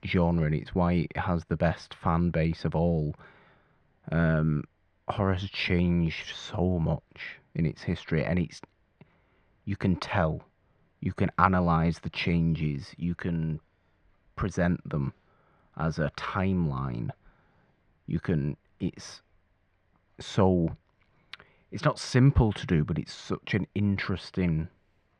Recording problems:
muffled; slightly; fading above 2.5 kHz

